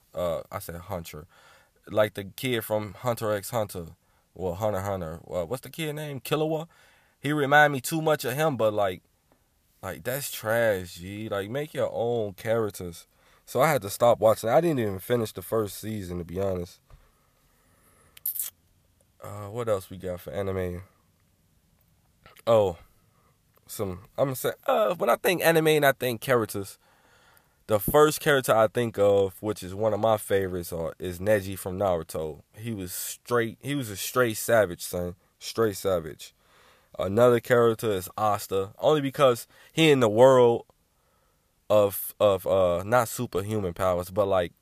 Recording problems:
none

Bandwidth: 14.5 kHz